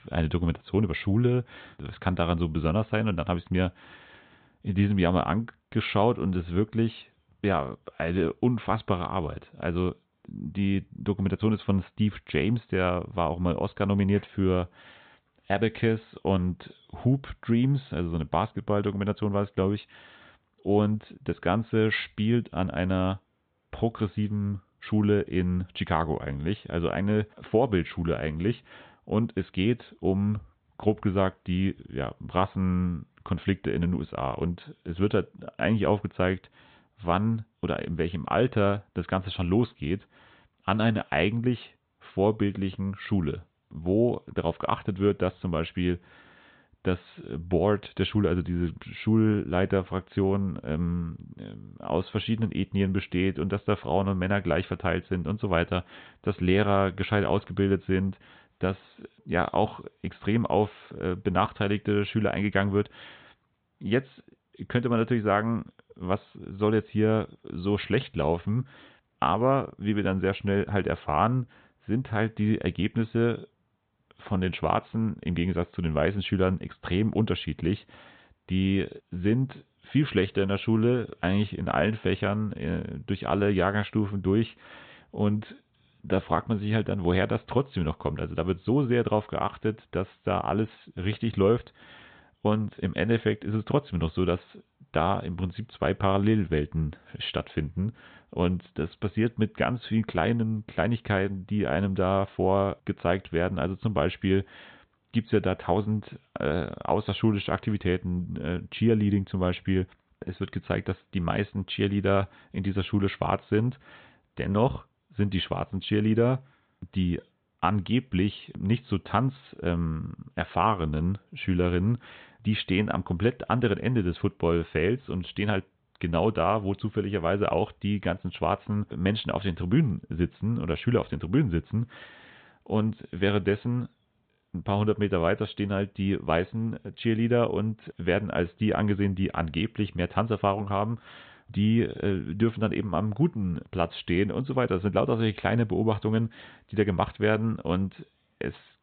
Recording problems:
high frequencies cut off; severe; nothing above 4 kHz

